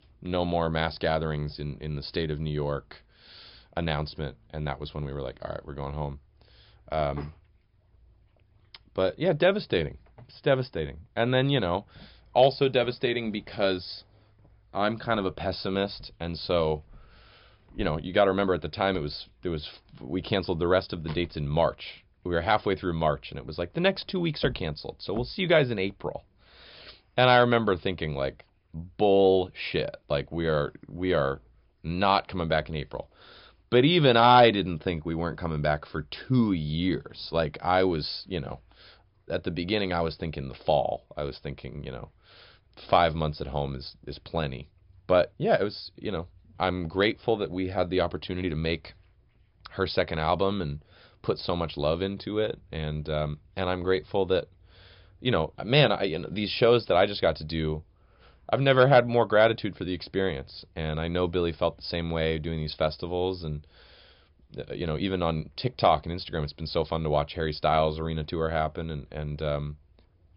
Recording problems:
high frequencies cut off; noticeable; nothing above 5.5 kHz

